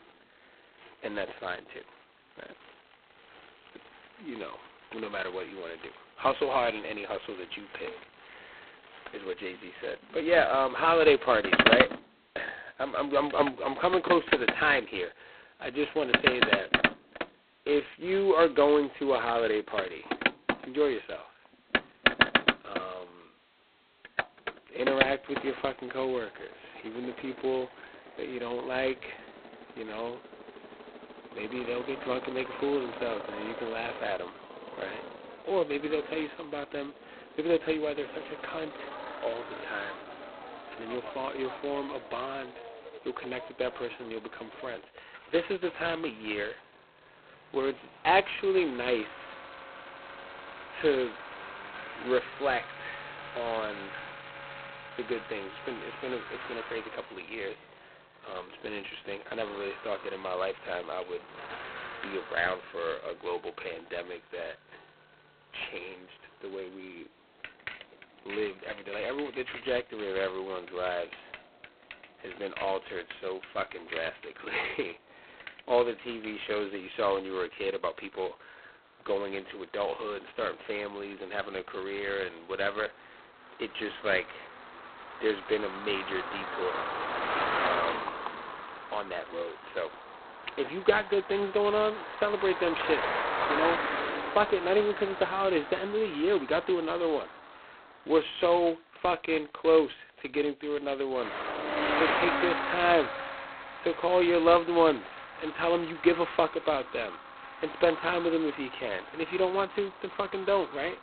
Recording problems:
phone-call audio; poor line; nothing above 4 kHz
traffic noise; loud; throughout; 3 dB below the speech

